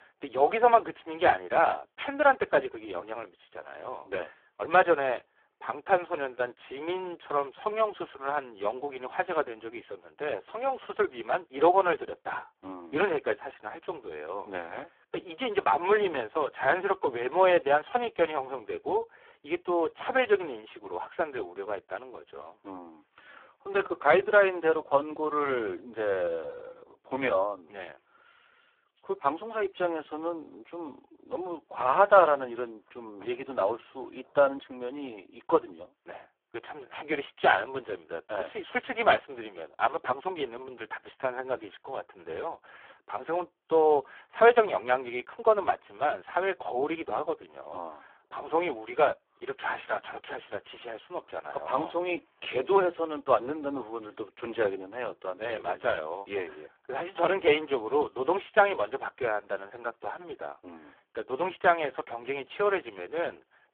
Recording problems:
phone-call audio; poor line

